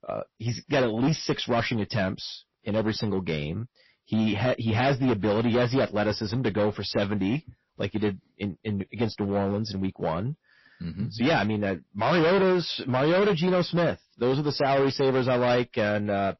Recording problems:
distortion; heavy; 13% of the sound clipped
garbled, watery; slightly; nothing above 5.5 kHz

